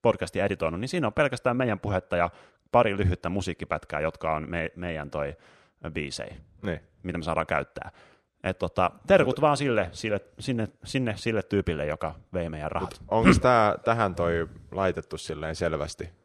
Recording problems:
none

